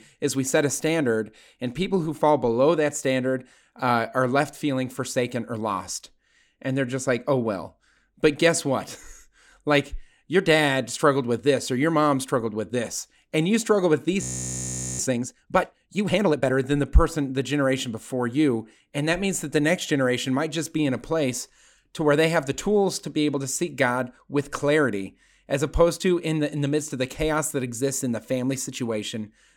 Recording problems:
audio freezing; at 14 s for 1 s

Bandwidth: 17 kHz